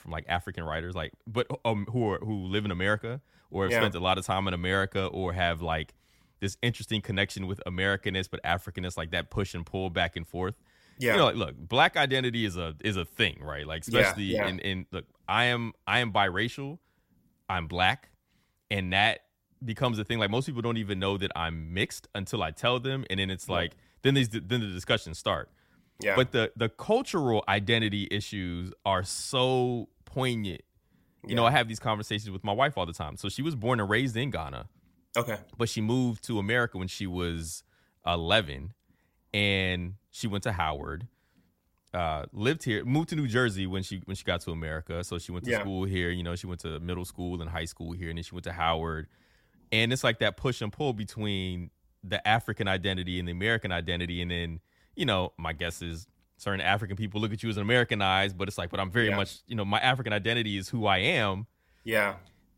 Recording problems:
none

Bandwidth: 16 kHz